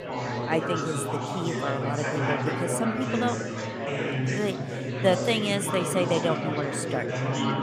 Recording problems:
chatter from many people; loud; throughout; as loud as the speech

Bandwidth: 15 kHz